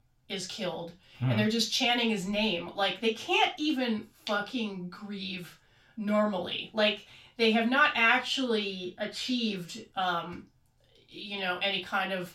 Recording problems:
off-mic speech; far
room echo; slight; dies away in 0.3 s

